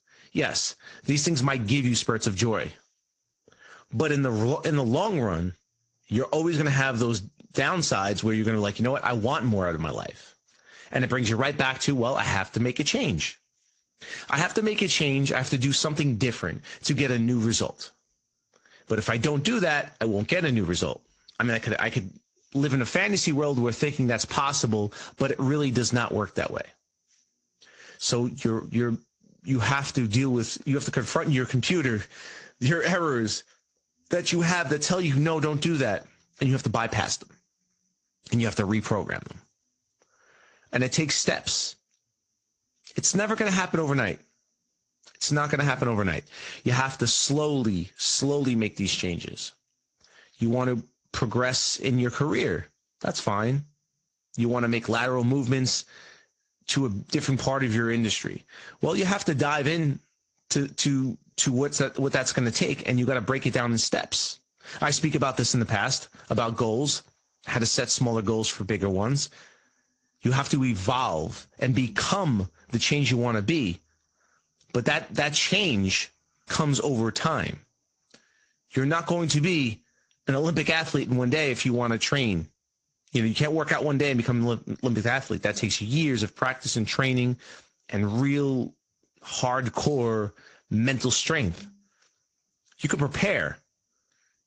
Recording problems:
garbled, watery; slightly
high-pitched whine; very faint; throughout; 6 kHz, 55 dB below the speech

